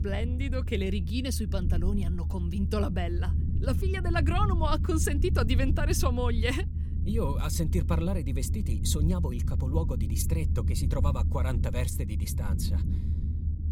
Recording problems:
low rumble; noticeable; throughout; 10 dB below the speech

